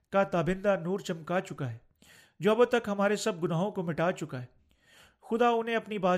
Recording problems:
abrupt cut into speech; at the end

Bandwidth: 15 kHz